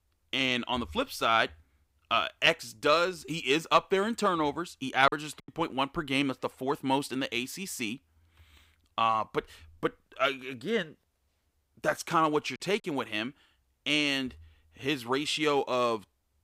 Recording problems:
choppy; very; at 5 s and at 13 s; 9% of the speech affected

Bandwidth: 15.5 kHz